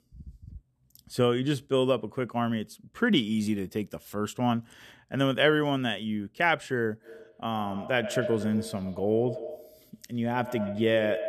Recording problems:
echo of what is said; strong; from 7 s on; 110 ms later, 10 dB below the speech

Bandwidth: 13.5 kHz